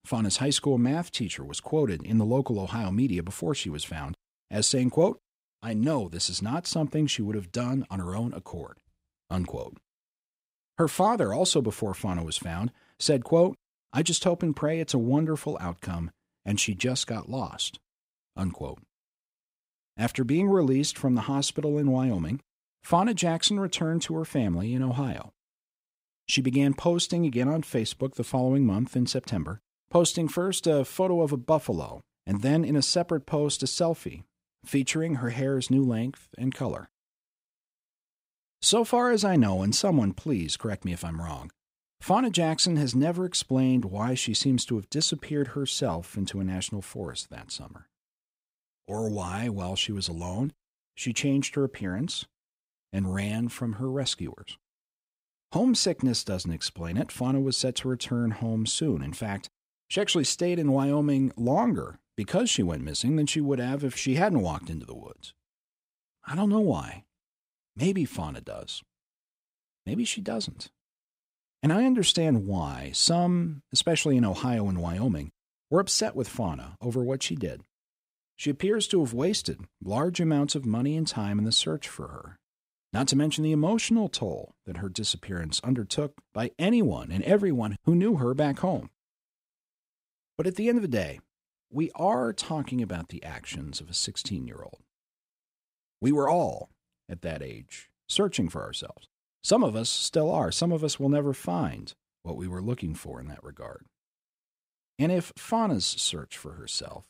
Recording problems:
none

